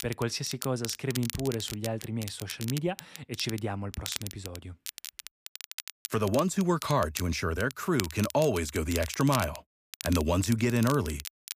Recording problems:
crackle, like an old record; noticeable; 10 dB below the speech

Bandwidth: 15 kHz